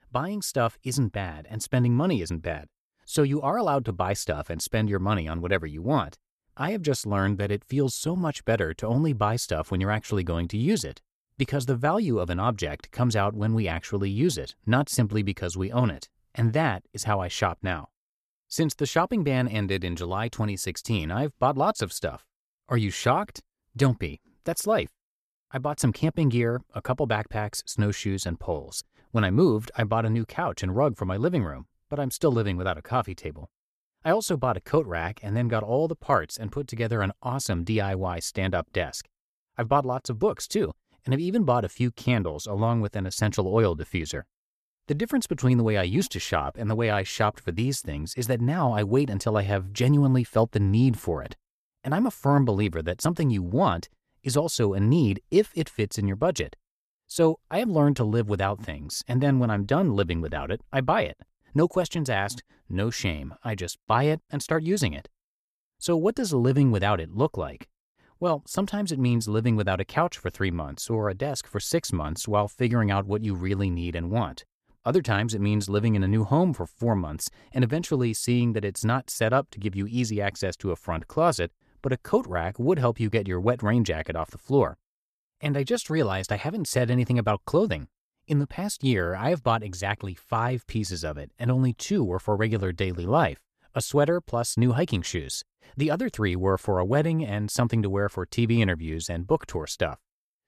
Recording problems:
none

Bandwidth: 14 kHz